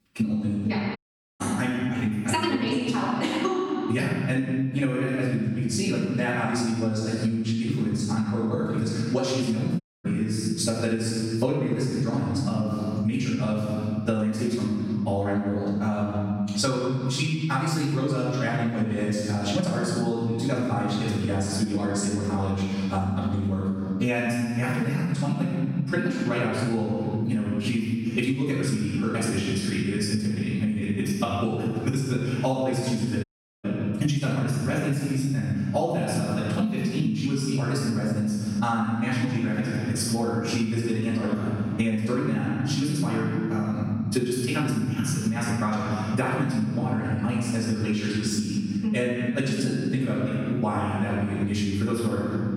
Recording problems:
room echo; strong; dies away in 1.4 s
off-mic speech; far
wrong speed, natural pitch; too fast; 1.8 times normal speed
squashed, flat; somewhat
audio cutting out; at 1 s, at 10 s and at 33 s

